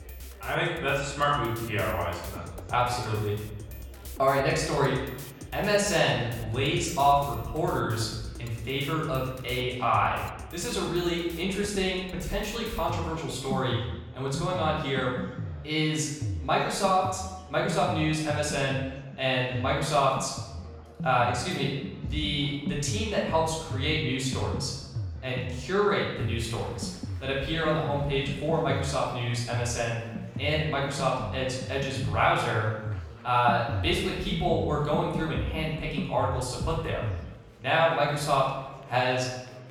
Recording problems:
off-mic speech; far
room echo; noticeable; dies away in 0.9 s
background music; noticeable; throughout; 10 dB below the speech
murmuring crowd; faint; throughout; 25 dB below the speech

